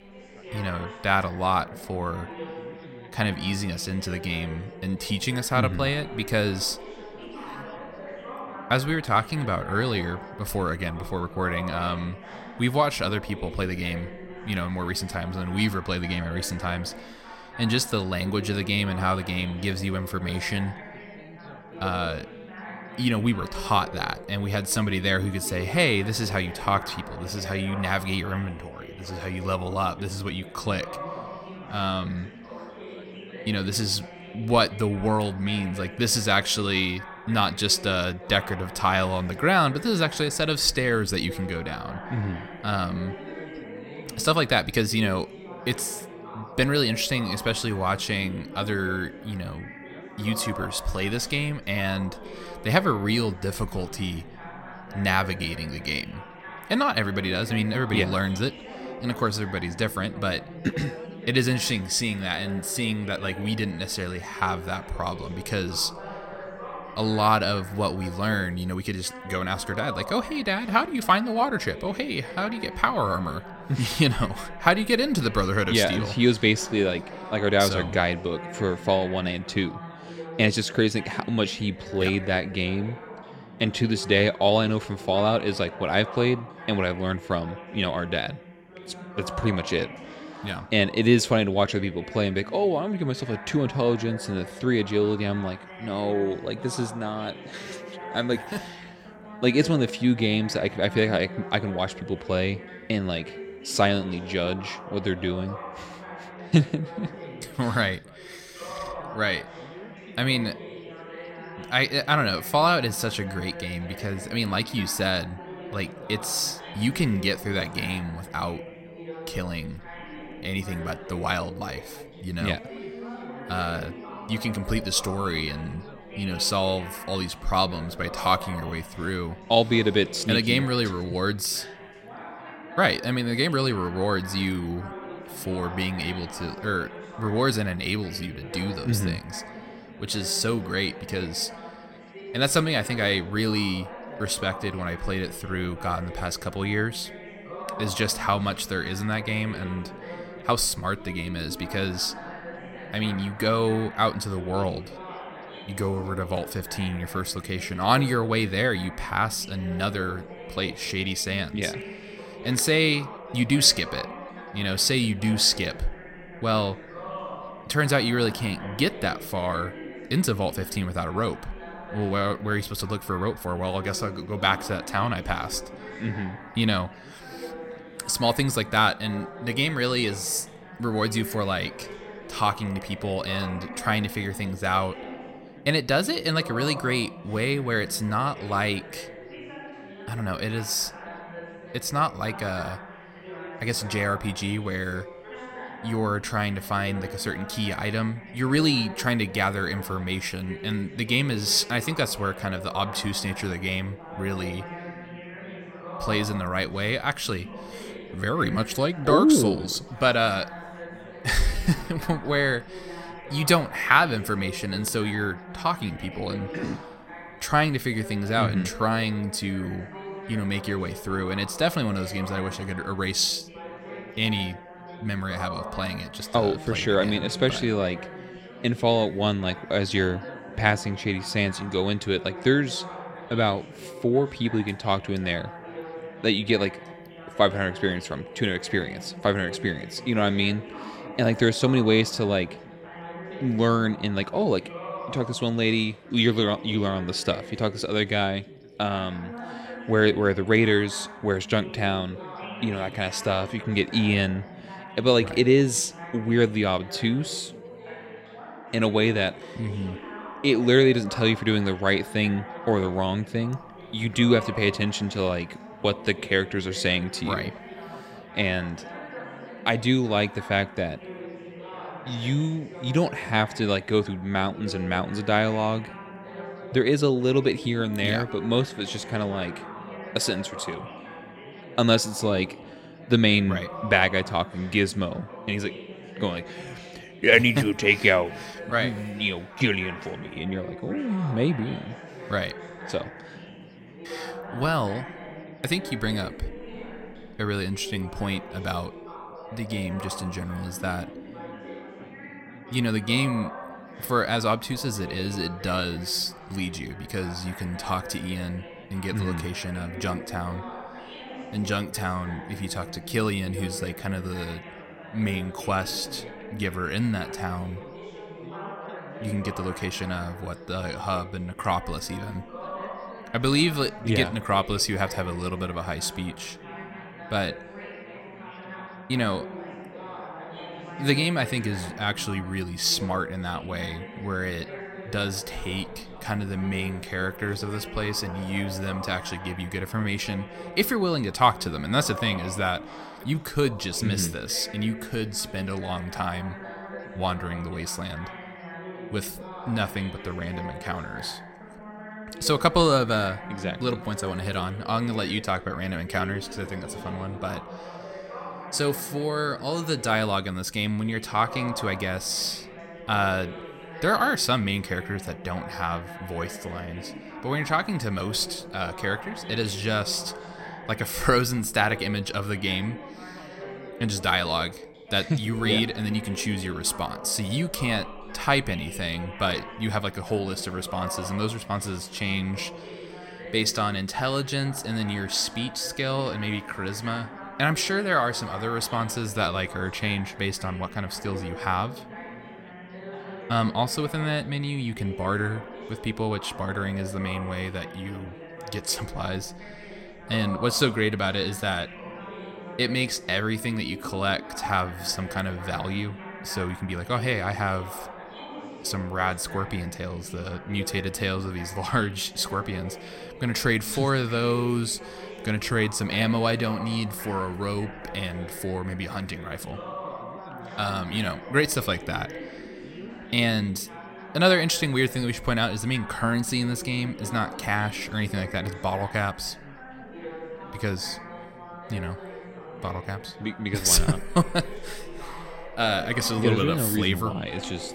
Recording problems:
background chatter; noticeable; throughout; 3 voices, 15 dB below the speech

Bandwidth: 16.5 kHz